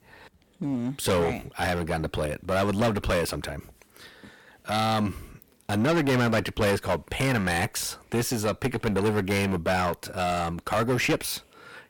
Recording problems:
distortion; heavy; 12% of the sound clipped

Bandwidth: 17.5 kHz